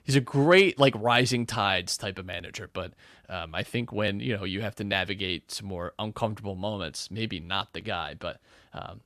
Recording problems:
none

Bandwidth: 13.5 kHz